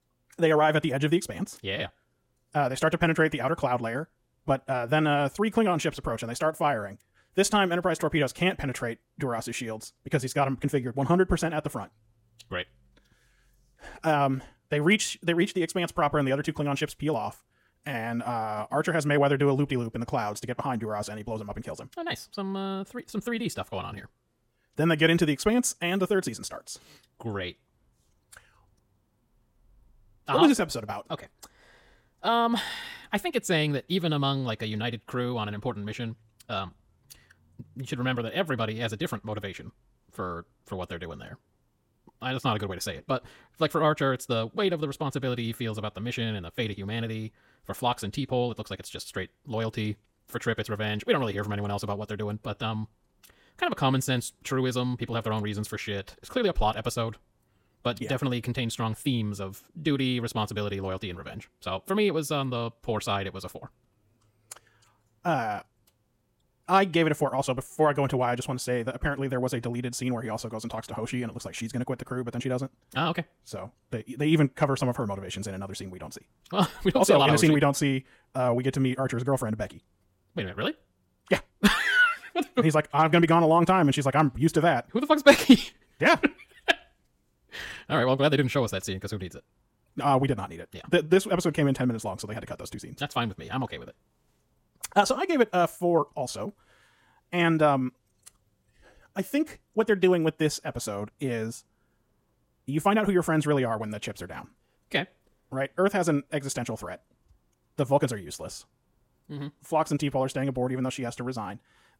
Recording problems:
wrong speed, natural pitch; too fast; 1.5 times normal speed

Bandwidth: 16.5 kHz